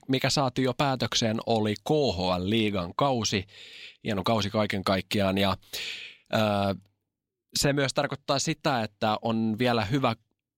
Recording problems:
none

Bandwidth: 16 kHz